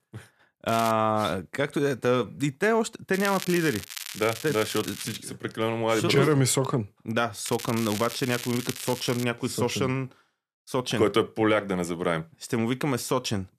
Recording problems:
crackling; loud; at 0.5 s, from 3 to 5 s and from 7.5 to 9 s; 10 dB below the speech

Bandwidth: 14.5 kHz